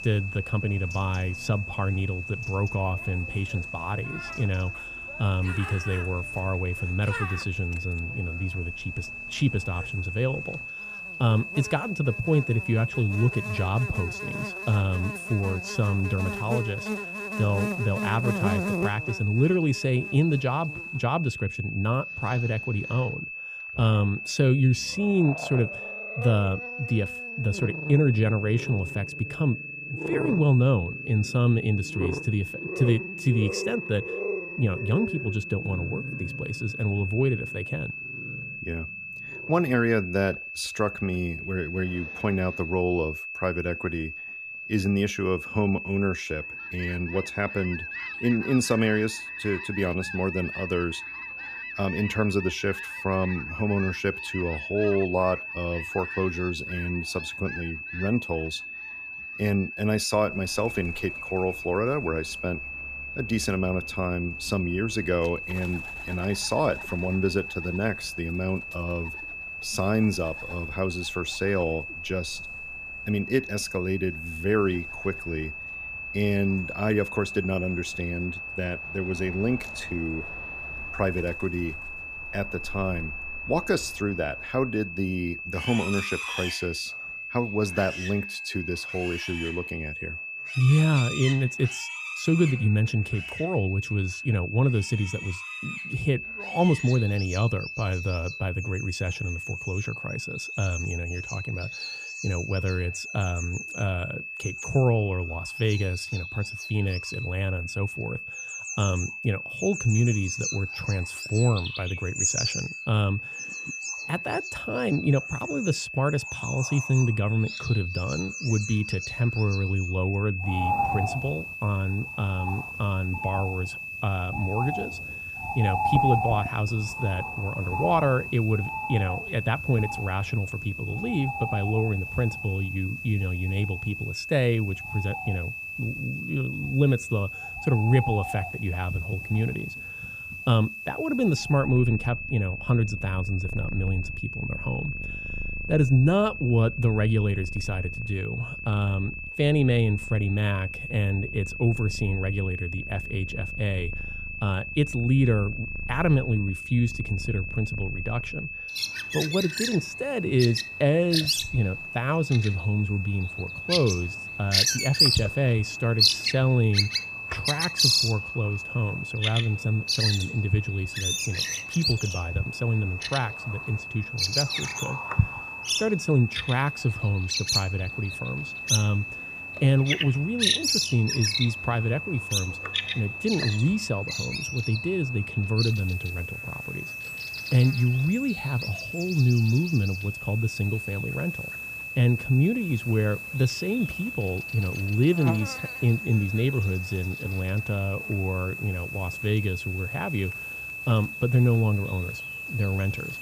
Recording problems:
high-pitched whine; loud; throughout; 2.5 kHz, 7 dB below the speech
animal sounds; loud; throughout; 5 dB below the speech

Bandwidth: 15 kHz